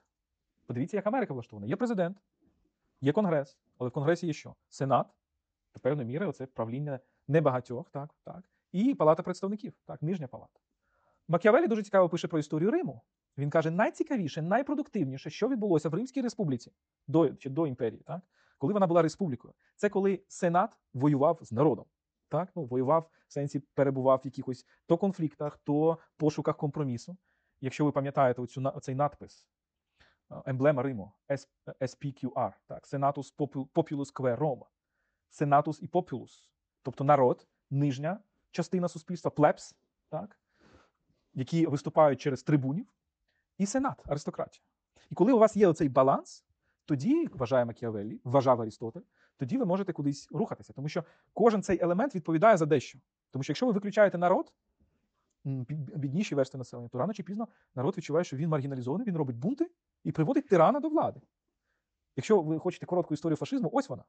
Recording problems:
wrong speed, natural pitch; too fast; 1.5 times normal speed
high frequencies cut off; noticeable; nothing above 8 kHz

